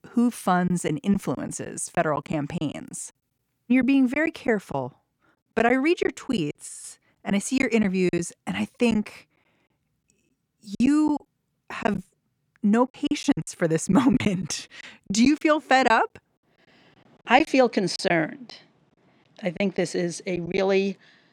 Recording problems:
choppy; very; 9% of the speech affected

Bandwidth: 18 kHz